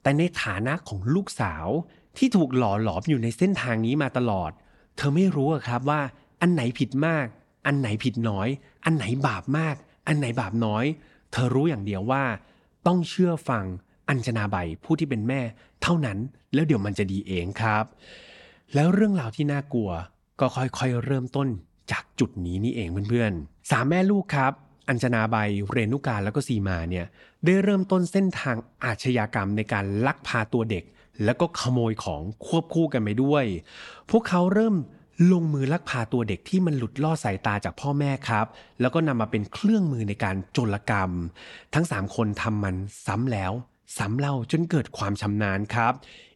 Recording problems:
none

